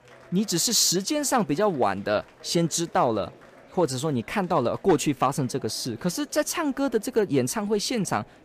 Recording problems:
murmuring crowd; faint; throughout; 25 dB below the speech

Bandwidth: 15 kHz